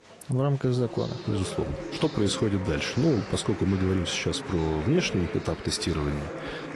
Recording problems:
garbled, watery; slightly
chatter from many people; loud; throughout; 10 dB below the speech

